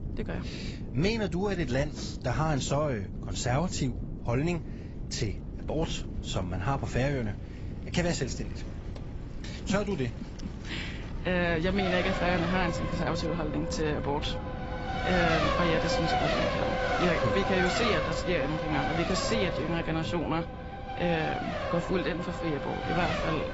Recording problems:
garbled, watery; badly; nothing above 7.5 kHz
traffic noise; loud; throughout; 2 dB below the speech
wind noise on the microphone; occasional gusts; 15 dB below the speech

